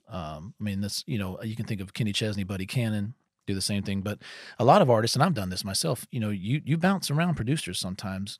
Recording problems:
none

